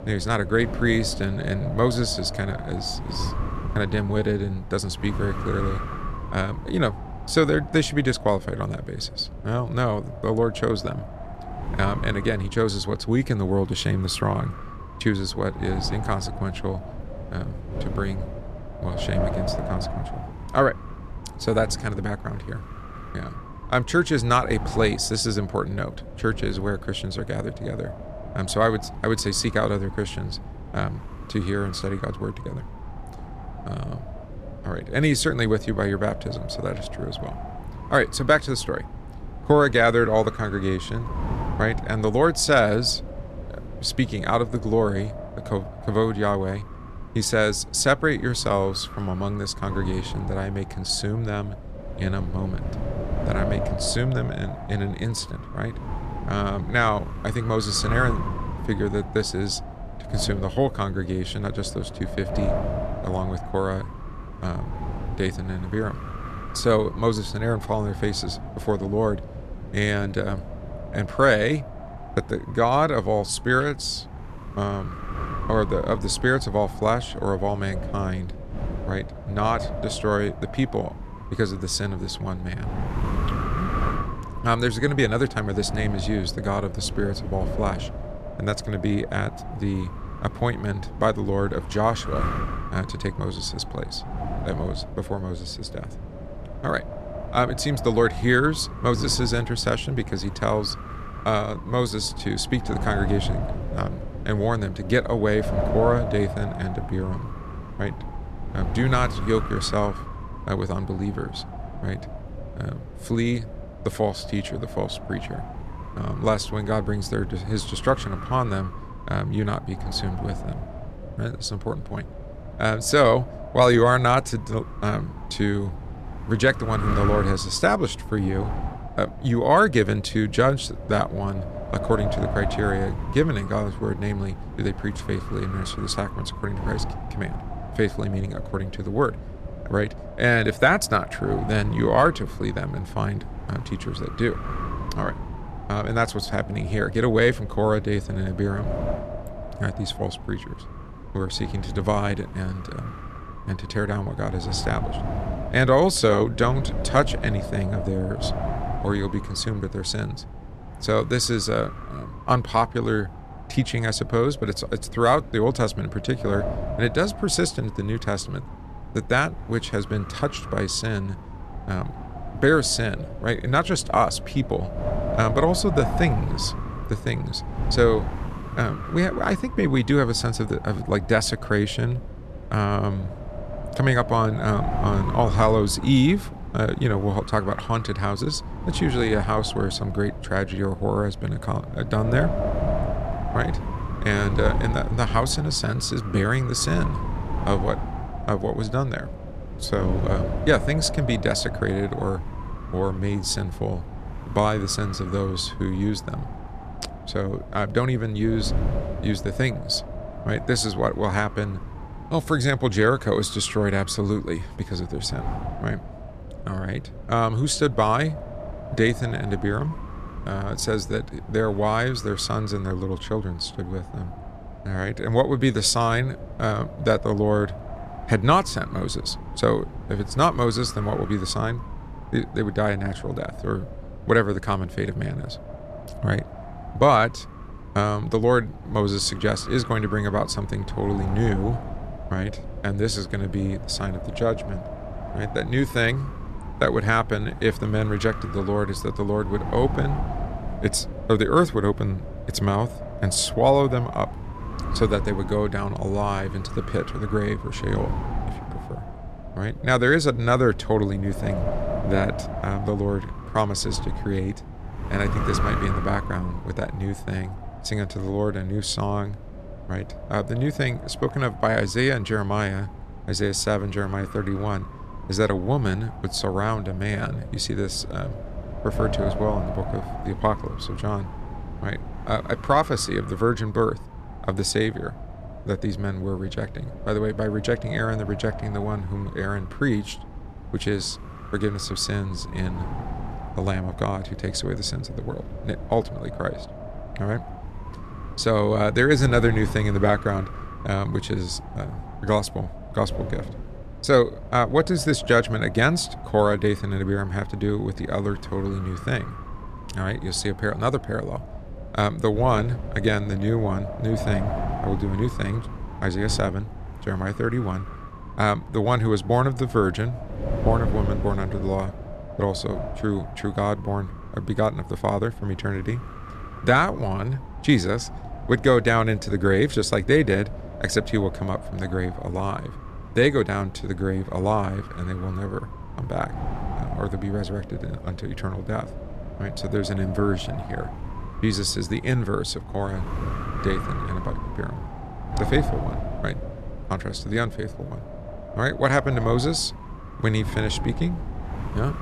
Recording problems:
wind noise on the microphone; occasional gusts; 10 dB below the speech

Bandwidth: 13.5 kHz